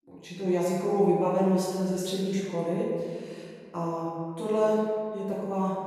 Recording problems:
room echo; strong; dies away in 1.8 s
off-mic speech; far

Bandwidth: 15 kHz